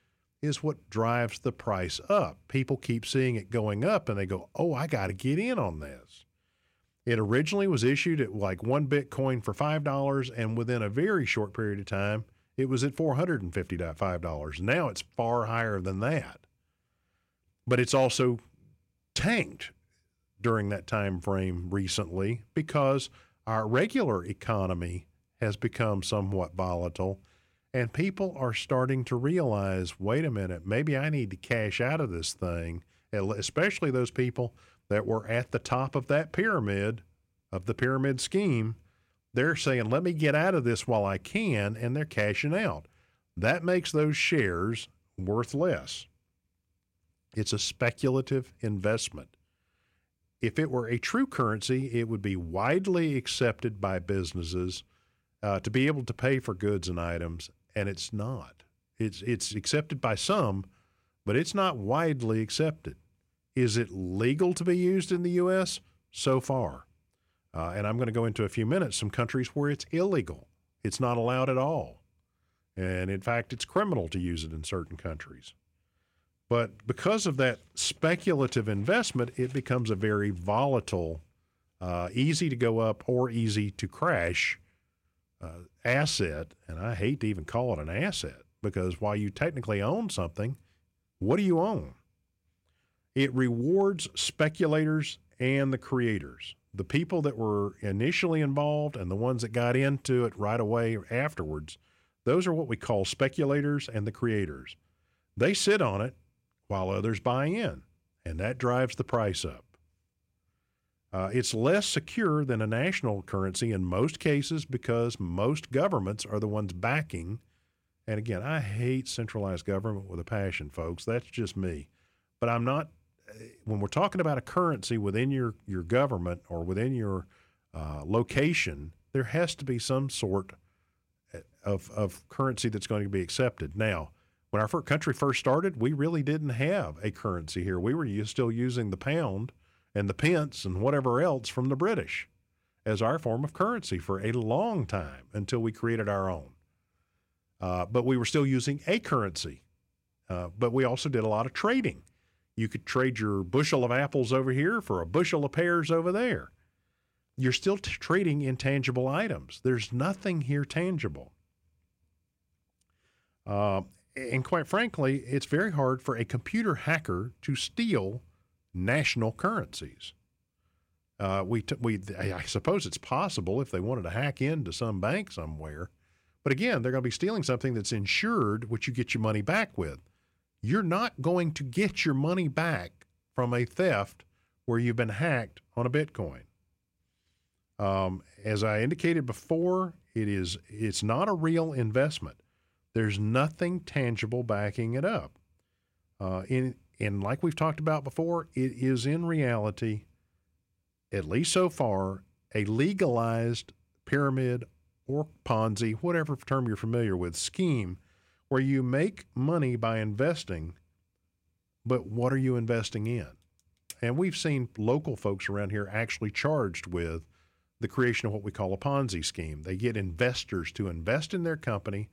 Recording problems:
none

